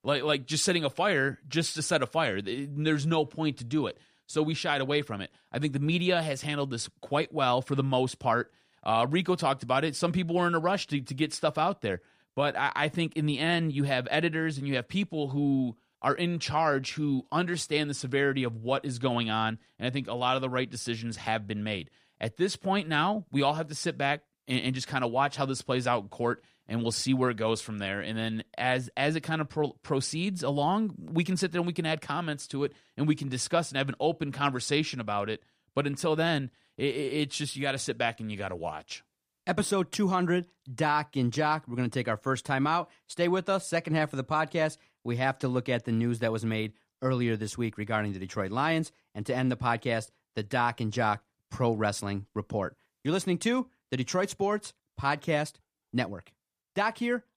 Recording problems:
none

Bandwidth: 15 kHz